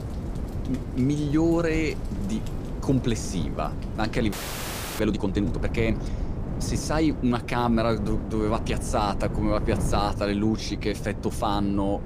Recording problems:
wind noise on the microphone; occasional gusts; 10 dB below the speech
rain or running water; faint; throughout; 25 dB below the speech
audio freezing; at 4.5 s for 0.5 s

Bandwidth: 15 kHz